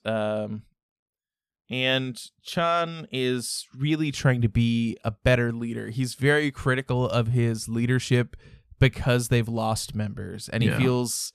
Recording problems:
none

